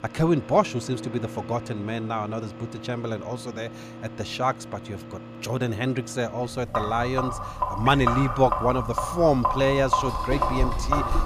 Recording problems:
household noises; loud; throughout; 5 dB below the speech

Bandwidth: 14.5 kHz